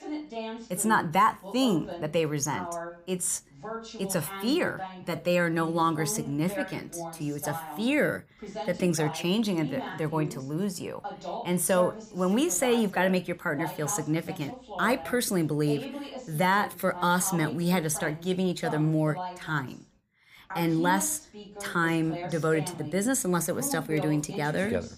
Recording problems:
voice in the background; noticeable; throughout; 10 dB below the speech

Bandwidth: 15 kHz